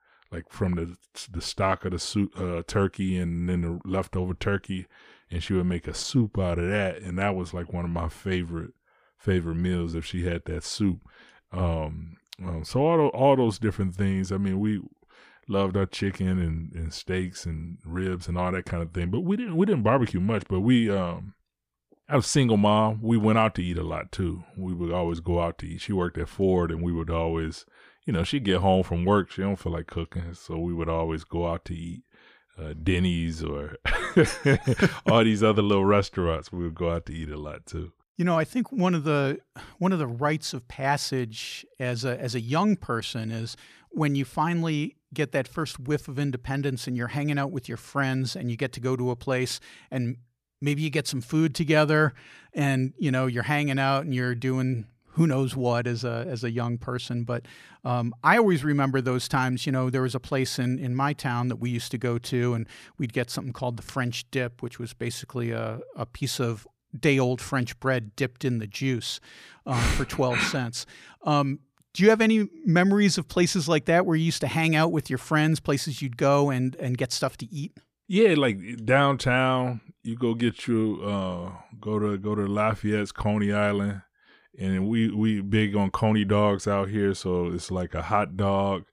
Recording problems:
none

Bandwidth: 14.5 kHz